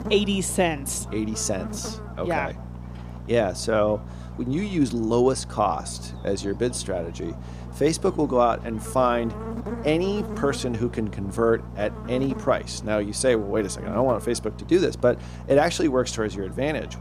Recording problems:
electrical hum; noticeable; throughout; 60 Hz, 15 dB below the speech

